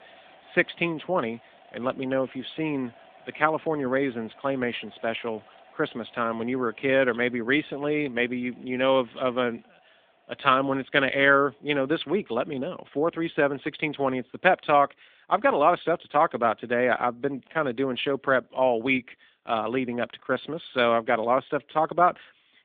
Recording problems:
phone-call audio
household noises; faint; throughout; 30 dB below the speech

